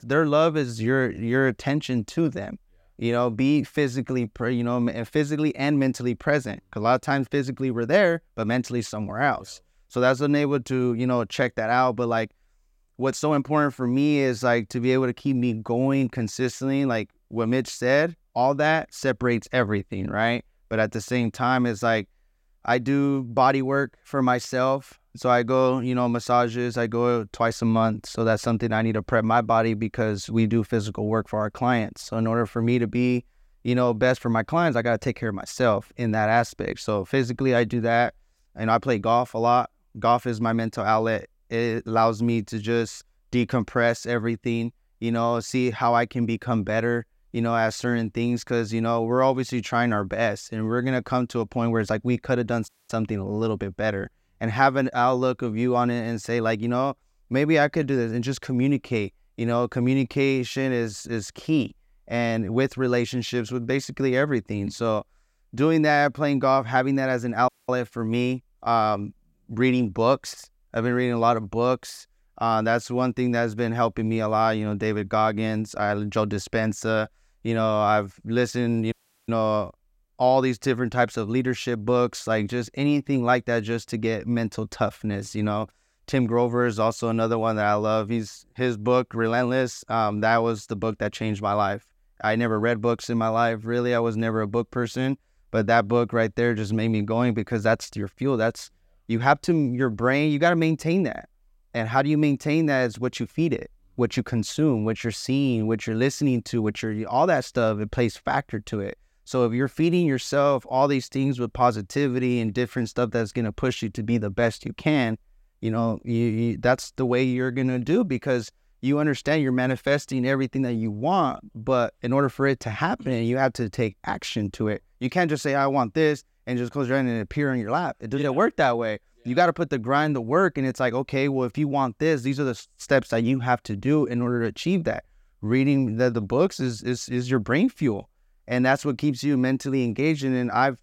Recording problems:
audio cutting out; at 53 s, at 1:07 and at 1:19

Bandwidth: 16 kHz